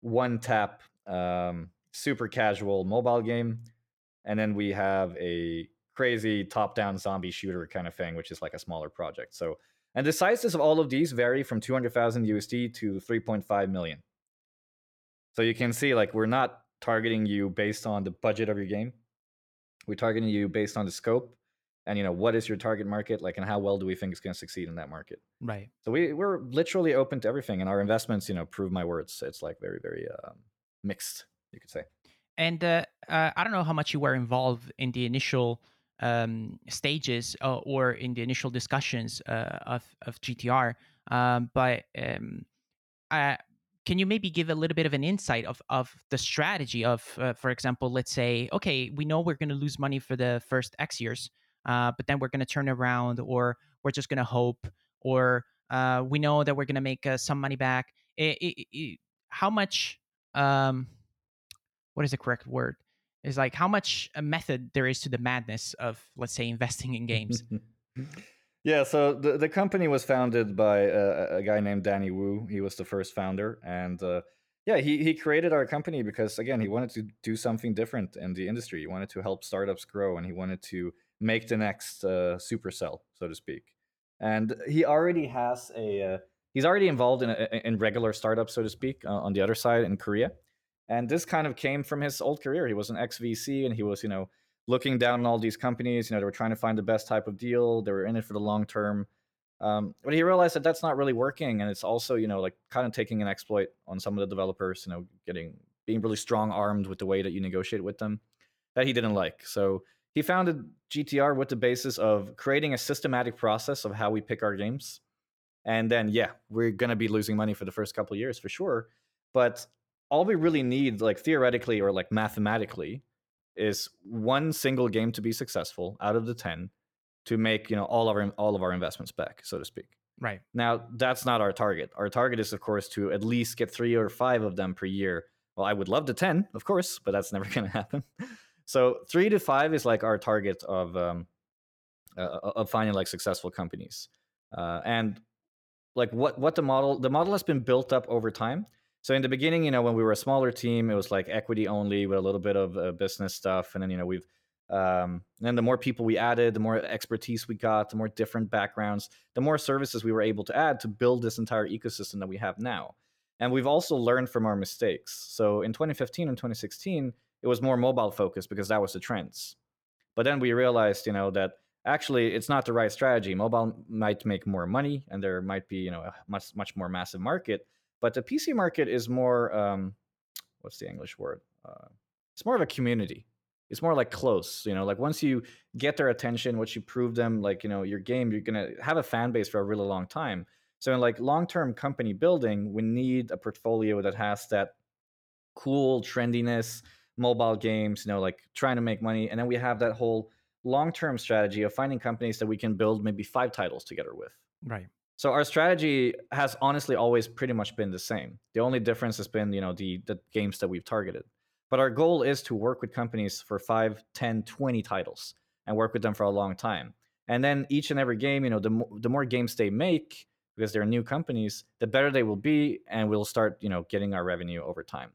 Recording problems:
none

